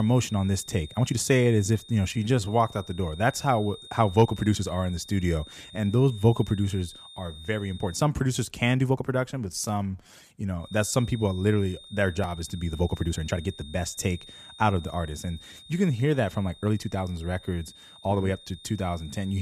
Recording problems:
high-pitched whine; noticeable; until 8 s and from 11 s on; 3.5 kHz, 20 dB below the speech
abrupt cut into speech; at the start and the end
uneven, jittery; strongly; from 1 to 19 s

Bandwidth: 14.5 kHz